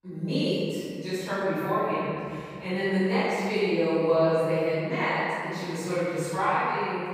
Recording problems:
room echo; strong; dies away in 2.5 s
off-mic speech; far

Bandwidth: 15.5 kHz